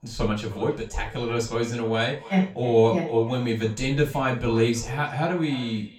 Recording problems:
off-mic speech; far
echo of what is said; noticeable; throughout; 310 ms later, 20 dB below the speech
room echo; slight; dies away in 0.3 s

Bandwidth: 17.5 kHz